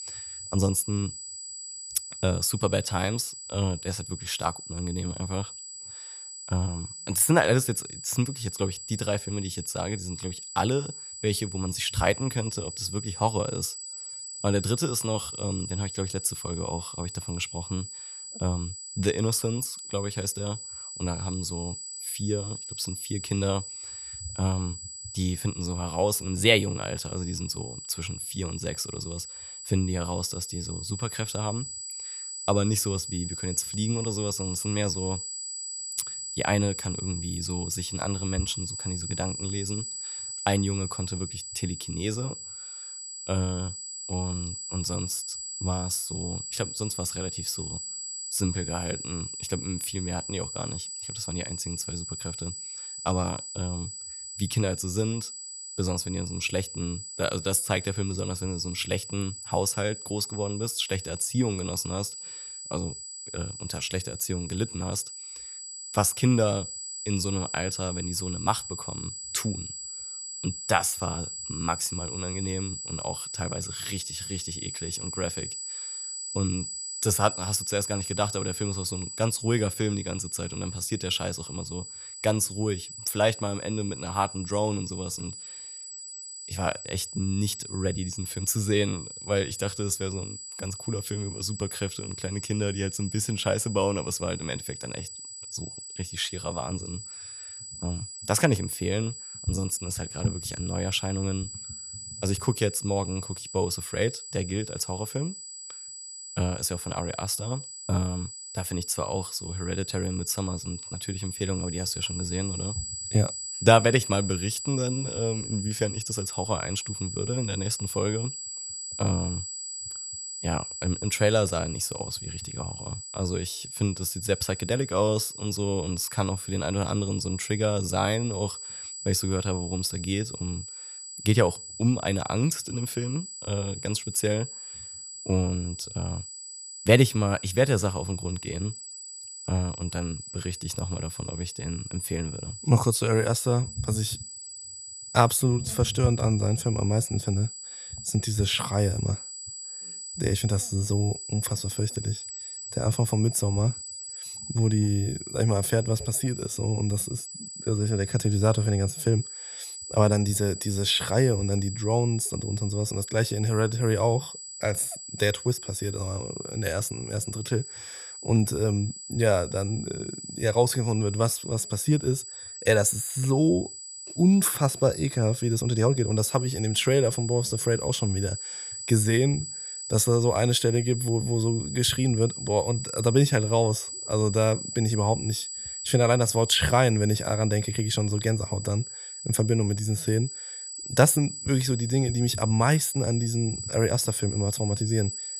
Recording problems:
high-pitched whine; loud; throughout; 8 kHz, 8 dB below the speech

